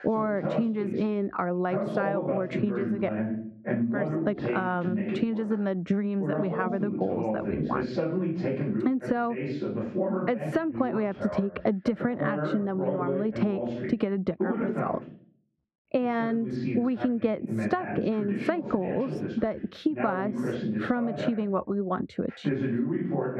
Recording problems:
muffled; very; fading above 3.5 kHz
squashed, flat; heavily, background pumping
voice in the background; loud; throughout; 2 dB below the speech

